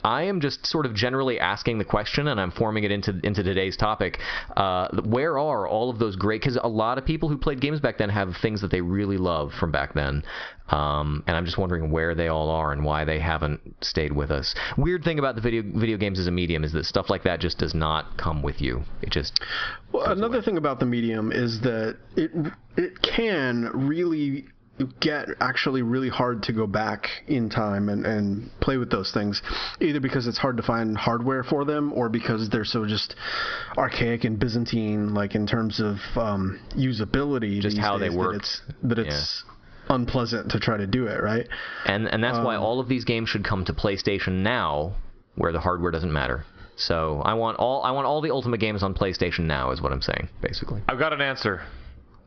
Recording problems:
squashed, flat; heavily
high frequencies cut off; noticeable; nothing above 5.5 kHz

